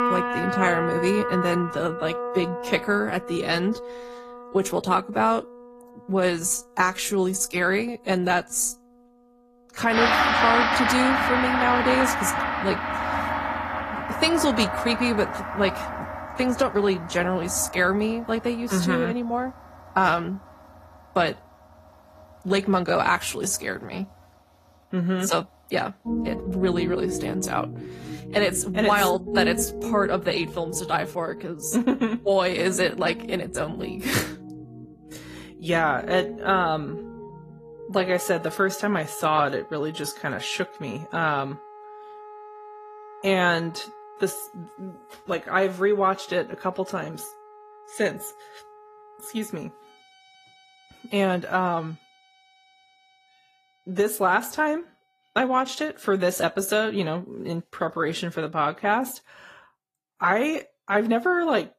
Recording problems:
garbled, watery; slightly; nothing above 14.5 kHz
background music; loud; throughout; 4 dB below the speech

